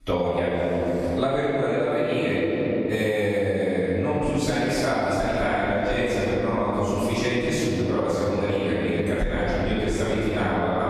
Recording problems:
room echo; strong; dies away in 2.9 s
off-mic speech; far
squashed, flat; somewhat

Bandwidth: 13.5 kHz